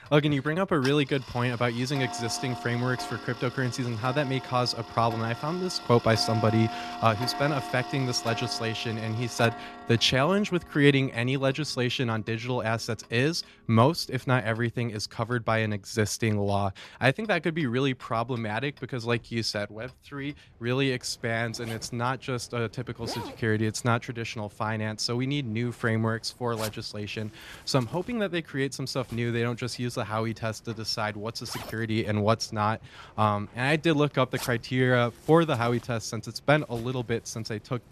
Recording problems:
household noises; noticeable; throughout; 10 dB below the speech

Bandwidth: 13.5 kHz